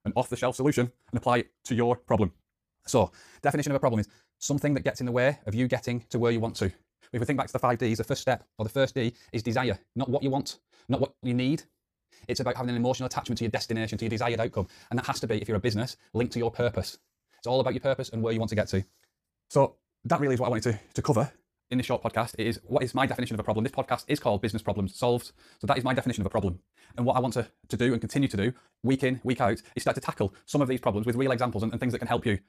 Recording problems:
wrong speed, natural pitch; too fast; 1.8 times normal speed

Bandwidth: 15 kHz